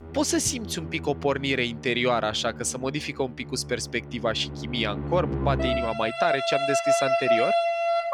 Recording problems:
background music; very loud; throughout; as loud as the speech

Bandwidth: 17.5 kHz